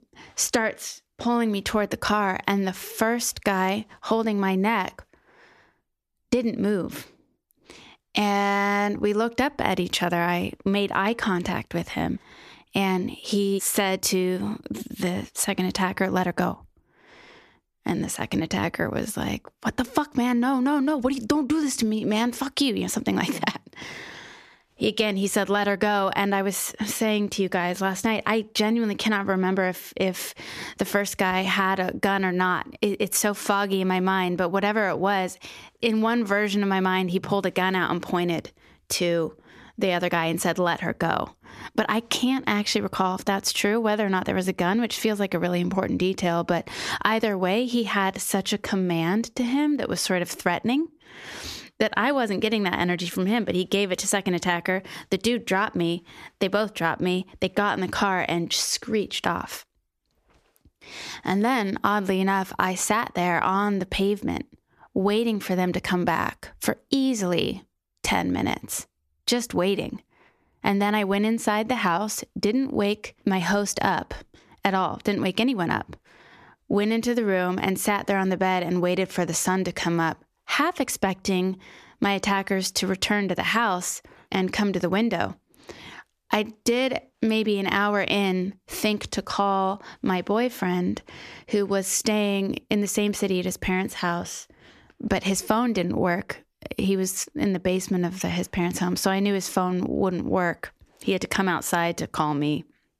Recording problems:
squashed, flat; somewhat

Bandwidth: 14.5 kHz